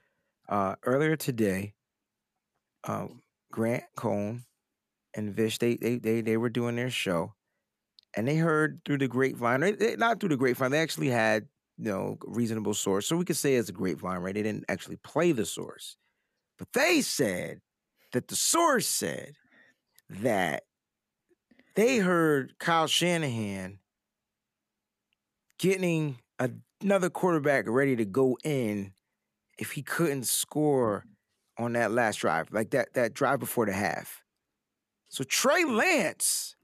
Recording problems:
none

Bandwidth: 14.5 kHz